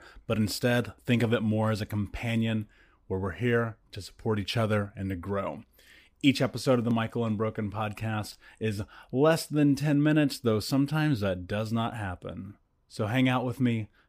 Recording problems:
none

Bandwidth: 15 kHz